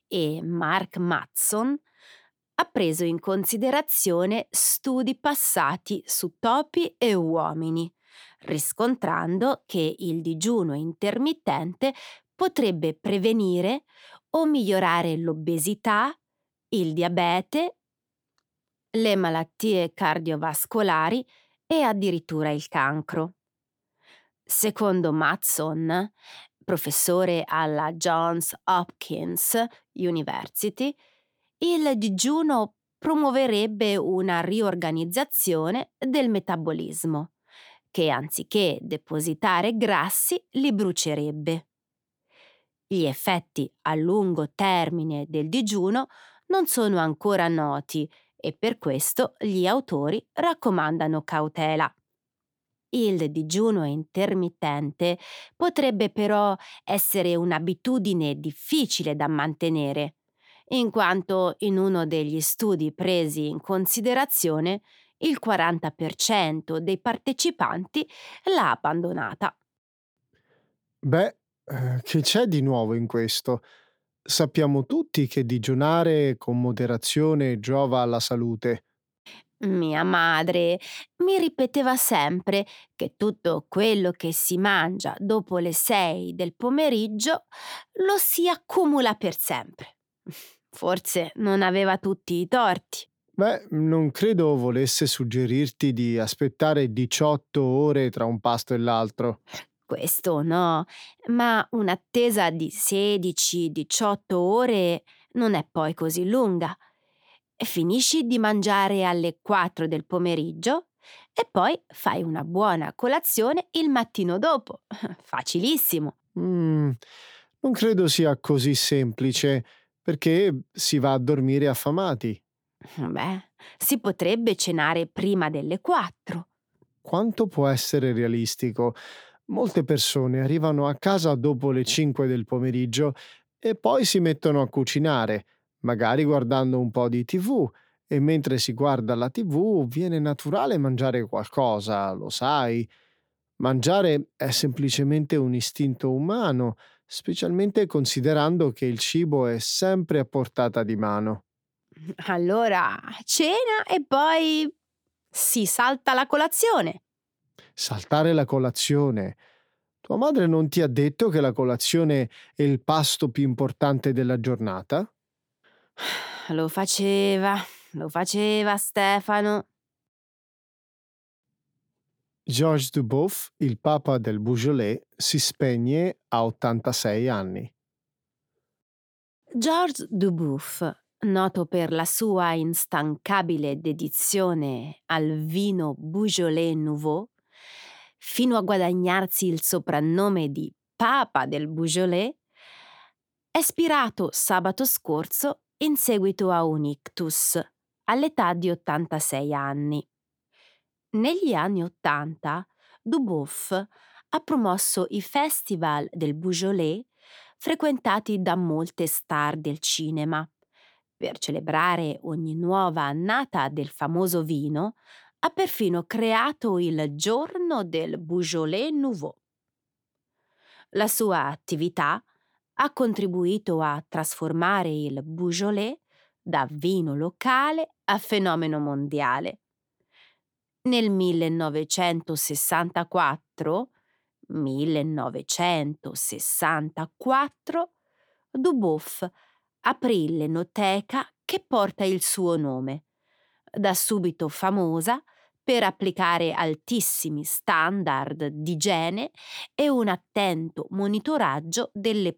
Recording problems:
none

